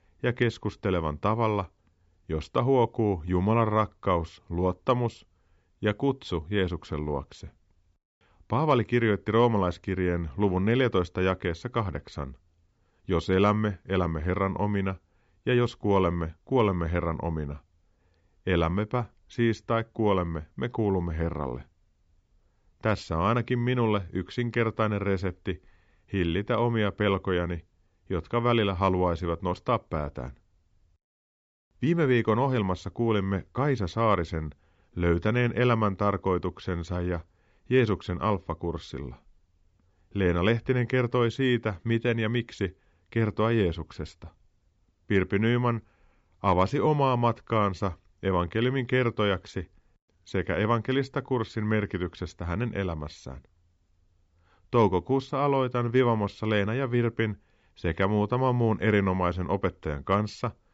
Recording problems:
high frequencies cut off; noticeable; nothing above 8 kHz

